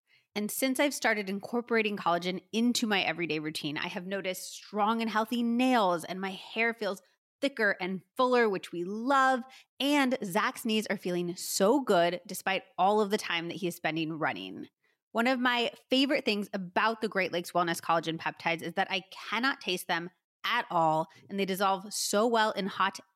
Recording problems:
none

